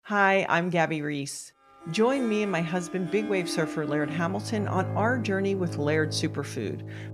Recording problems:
background music; loud; from 2 s on; 9 dB below the speech

